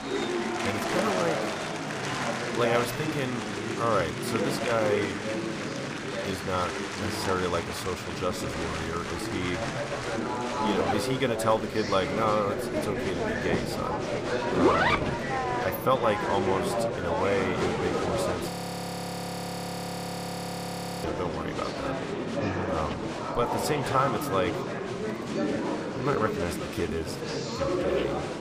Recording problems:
murmuring crowd; very loud; throughout; as loud as the speech
household noises; loud; from 8 s on; 3 dB below the speech
audio freezing; at 18 s for 2.5 s

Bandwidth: 15 kHz